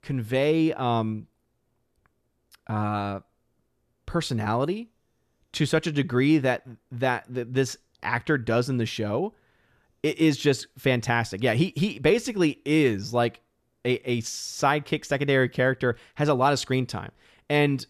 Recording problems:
none

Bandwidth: 14 kHz